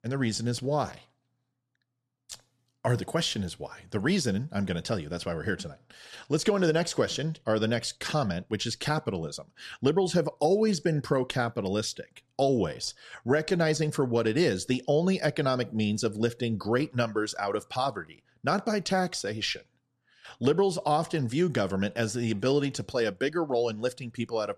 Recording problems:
none

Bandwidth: 13.5 kHz